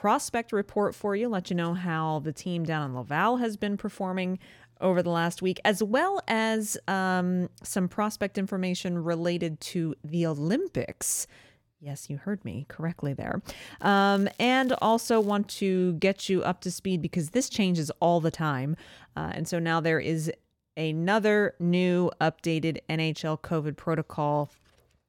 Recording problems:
crackling; faint; from 14 to 15 s; 25 dB below the speech

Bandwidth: 17 kHz